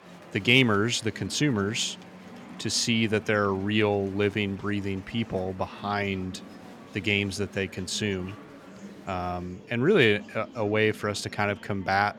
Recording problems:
murmuring crowd; noticeable; throughout; 20 dB below the speech

